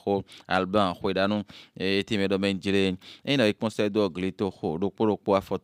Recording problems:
none

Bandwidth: 15.5 kHz